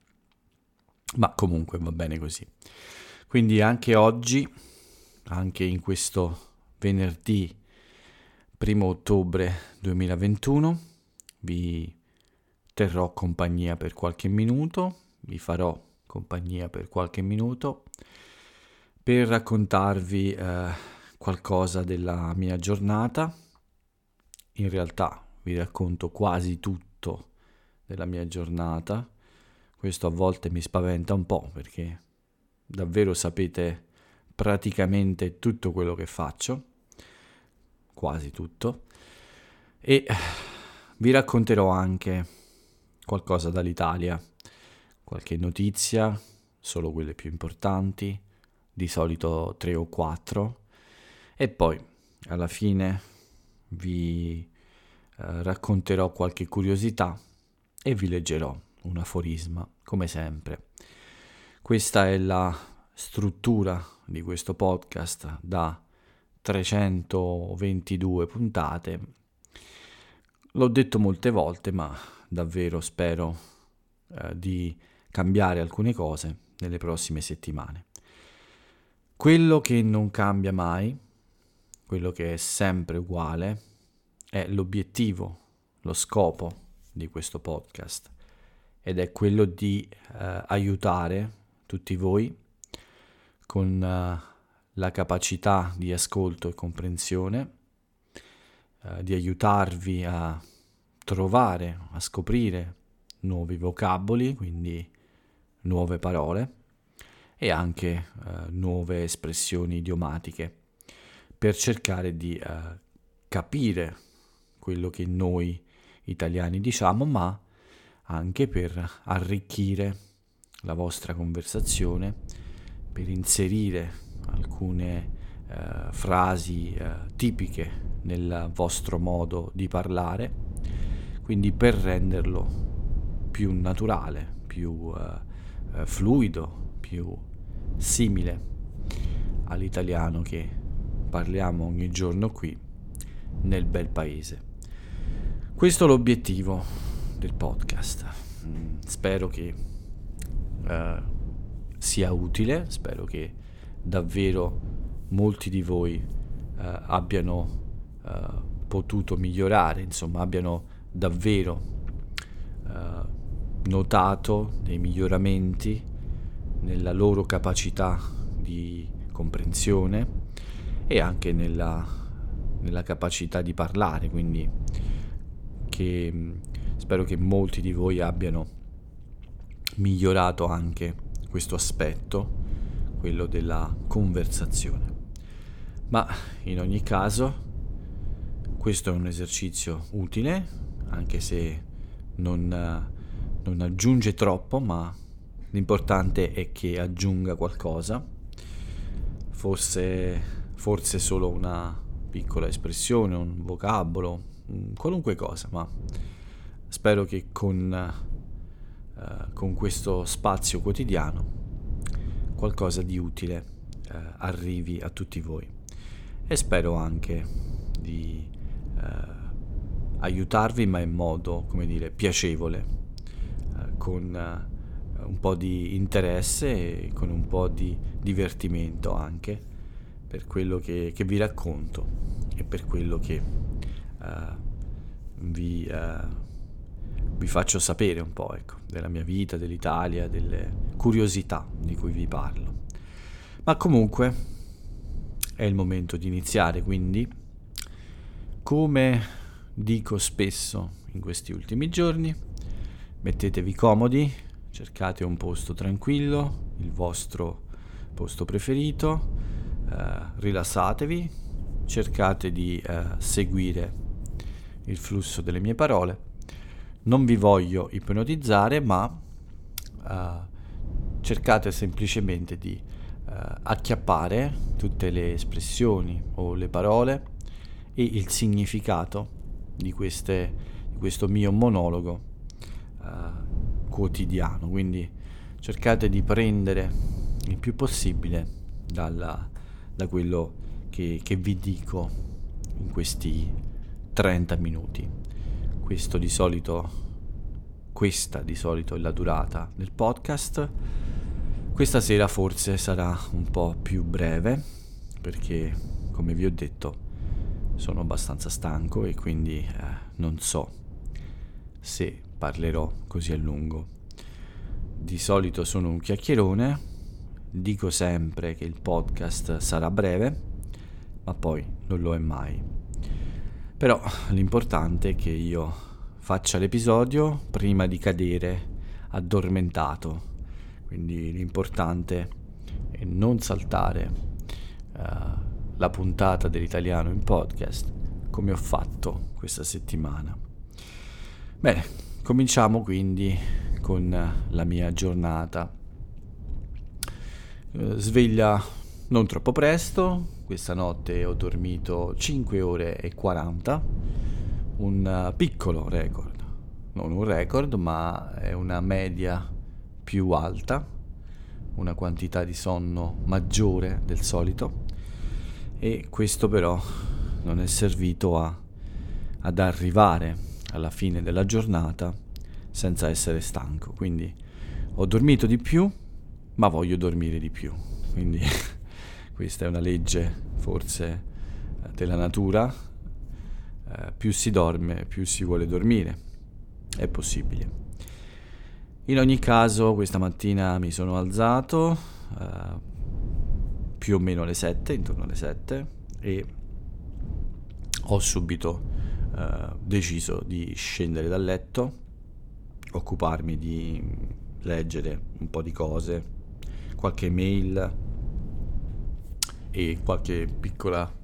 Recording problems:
low rumble; faint; from 2:02 on; 20 dB below the speech

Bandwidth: 17.5 kHz